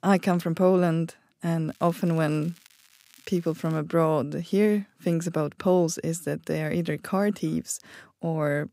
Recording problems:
crackling; faint; from 1.5 to 4 s; 30 dB below the speech

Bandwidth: 15.5 kHz